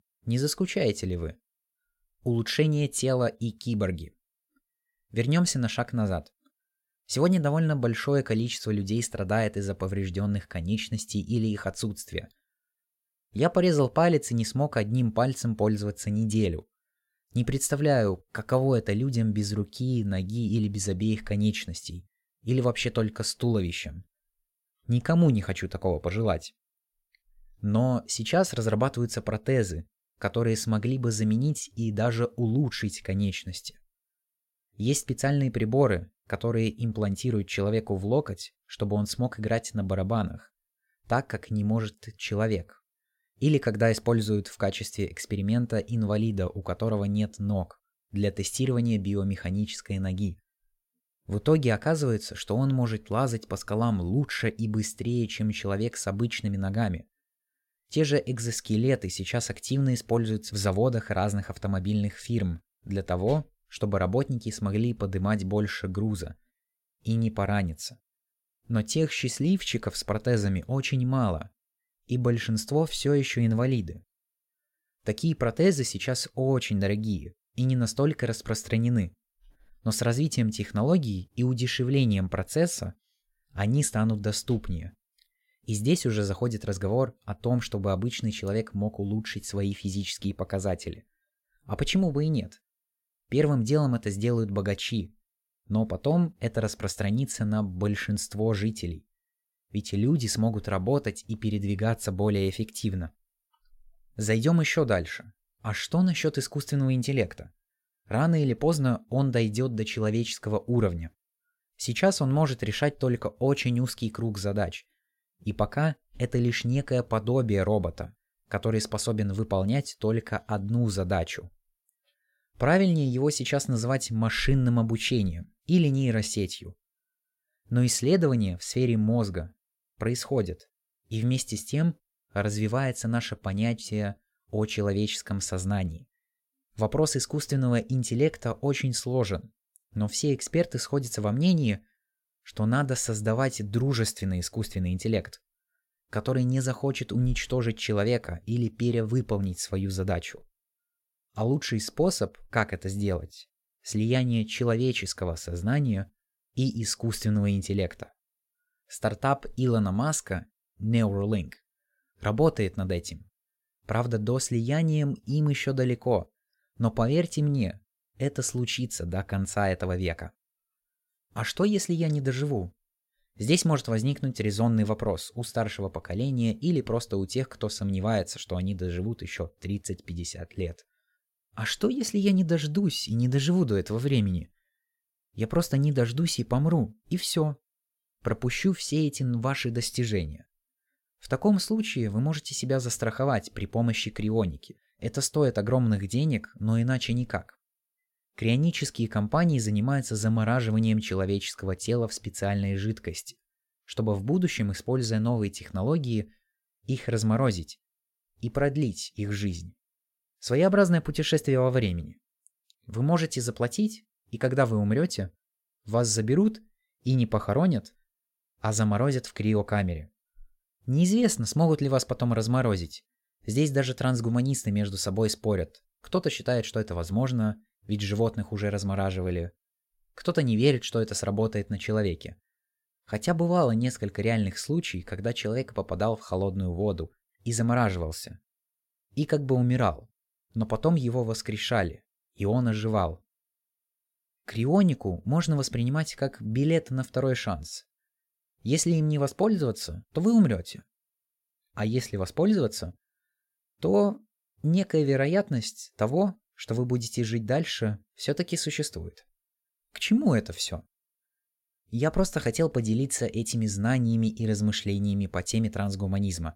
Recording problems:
none

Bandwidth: 16.5 kHz